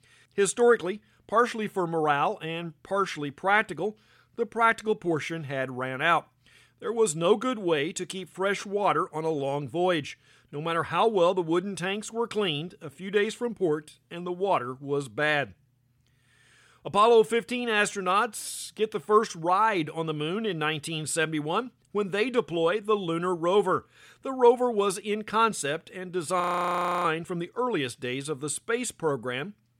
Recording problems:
audio freezing; at 26 s for 0.5 s

